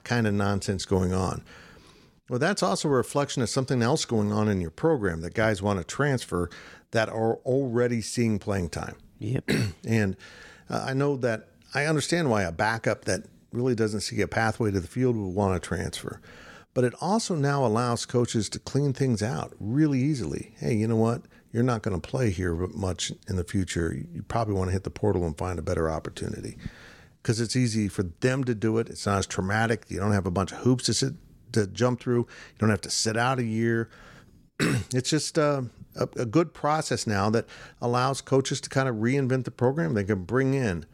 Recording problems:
none

